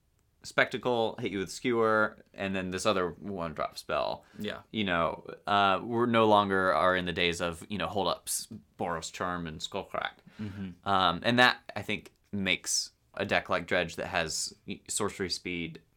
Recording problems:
uneven, jittery; strongly; from 3 to 15 s

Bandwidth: 18 kHz